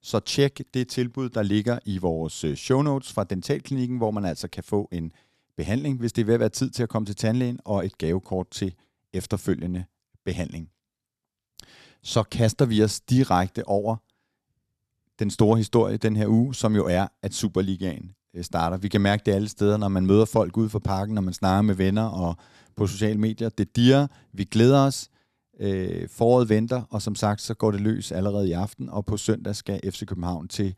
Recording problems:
none

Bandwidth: 13.5 kHz